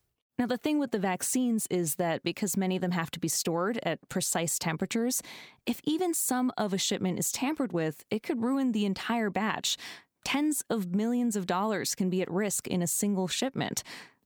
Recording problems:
squashed, flat; somewhat

